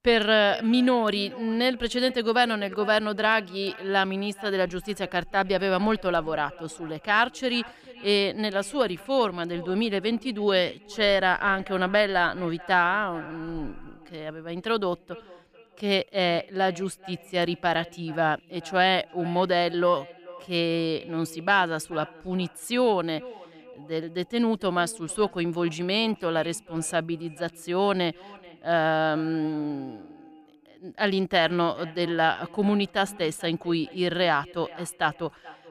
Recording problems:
echo of what is said; faint; throughout; 430 ms later, 20 dB below the speech

